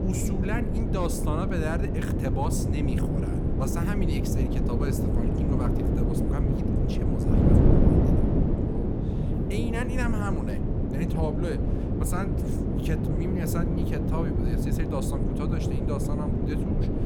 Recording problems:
wind noise on the microphone; heavy; 2 dB above the speech

